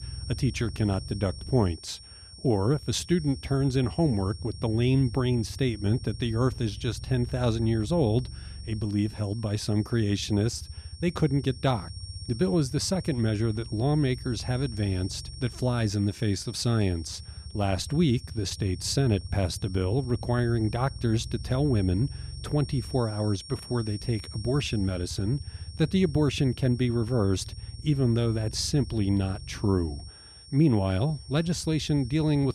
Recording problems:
high-pitched whine; noticeable; throughout; 5.5 kHz, 20 dB below the speech
low rumble; faint; throughout; 25 dB below the speech

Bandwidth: 14 kHz